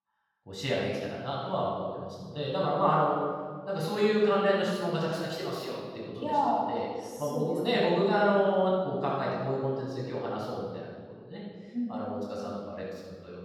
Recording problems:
room echo; strong; dies away in 1.5 s
off-mic speech; far

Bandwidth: 18.5 kHz